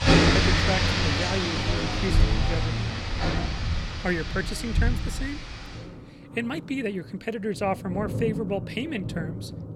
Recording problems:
rain or running water; very loud; throughout; 5 dB above the speech

